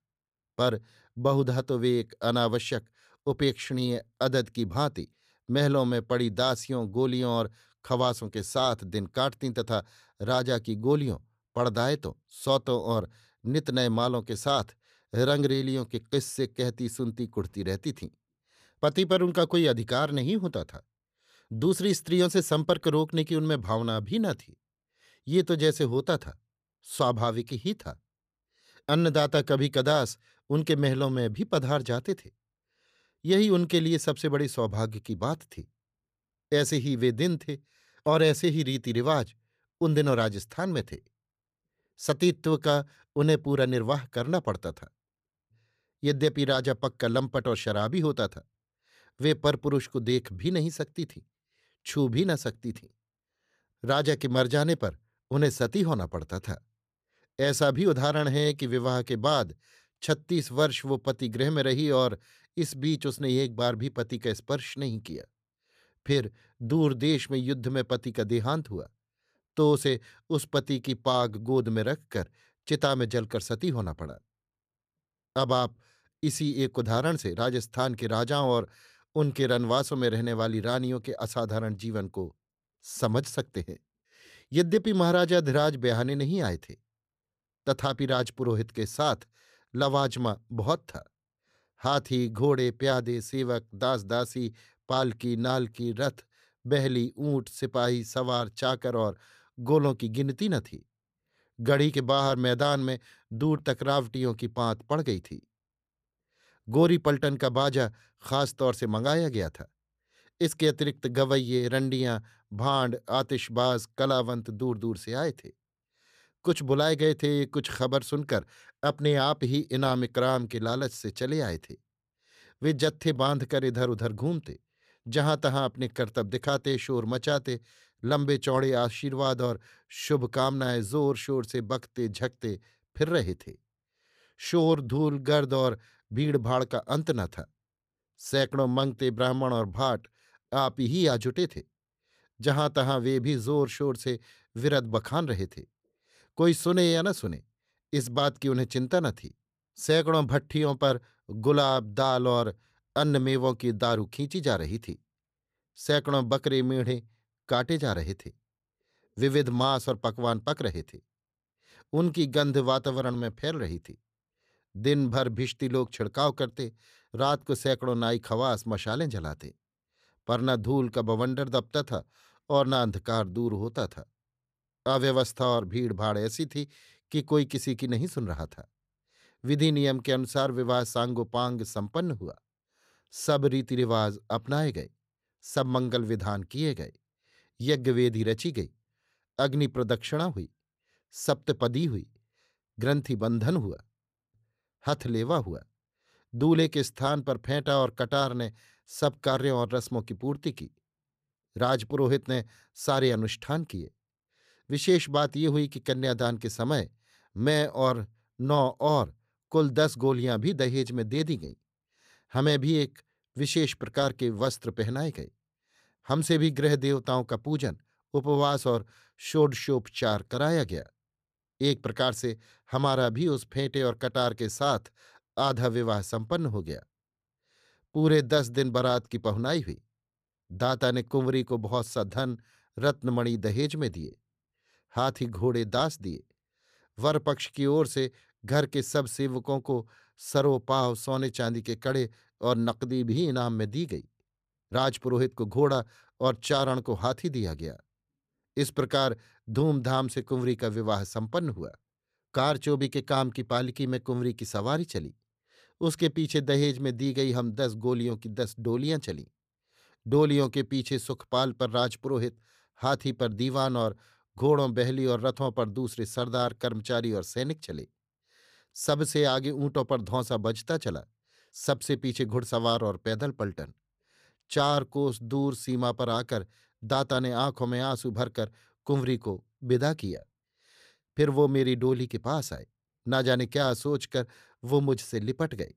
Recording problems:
none

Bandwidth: 14.5 kHz